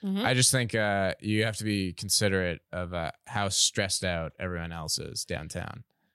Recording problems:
none

